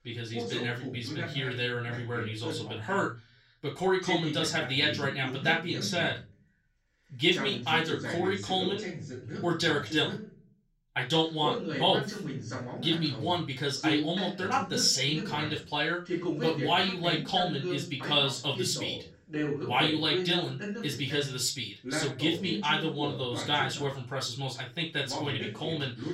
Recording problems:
off-mic speech; far
room echo; slight; dies away in 0.2 s
voice in the background; loud; throughout; 7 dB below the speech

